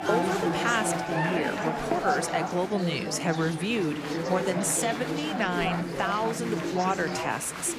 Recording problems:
chatter from many people; loud; throughout; 1 dB below the speech

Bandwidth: 15 kHz